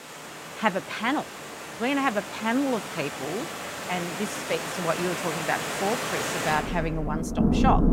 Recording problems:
rain or running water; loud; throughout; 2 dB below the speech

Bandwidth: 16.5 kHz